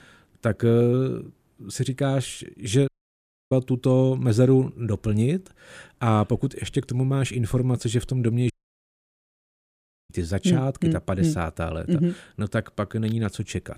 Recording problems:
audio cutting out; at 3 s for 0.5 s and at 8.5 s for 1.5 s

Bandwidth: 15 kHz